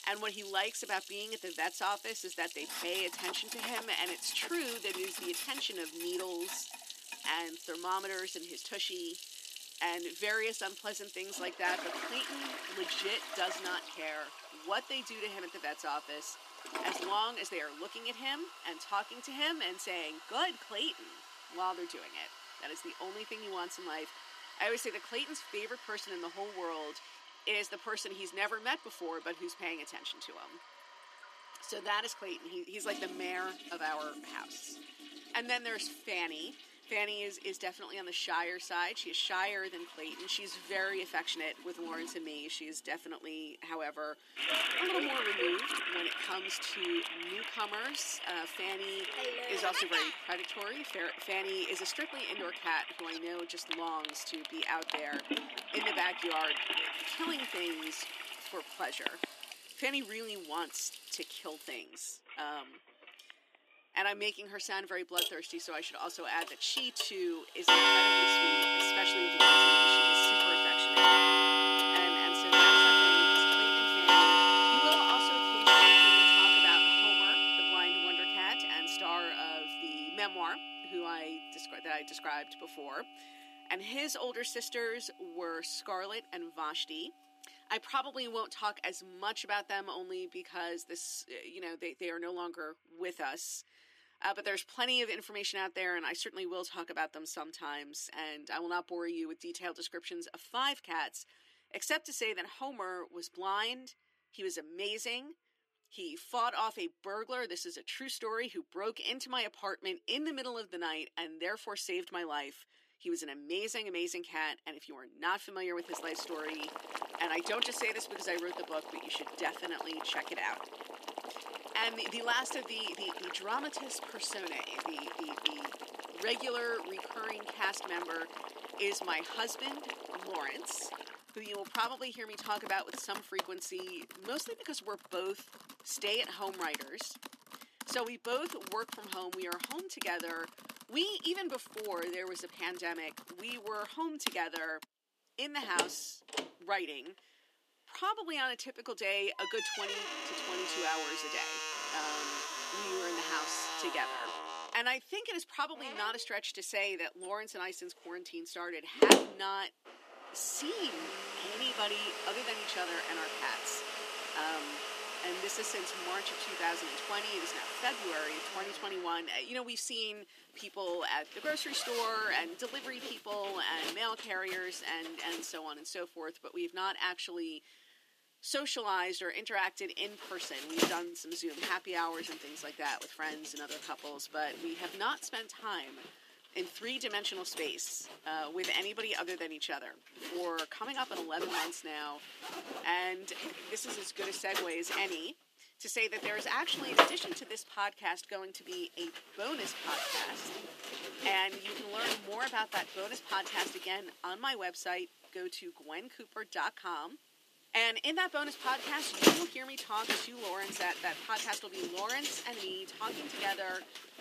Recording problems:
thin; somewhat; fading below 300 Hz
household noises; very loud; throughout; 8 dB above the speech

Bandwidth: 14.5 kHz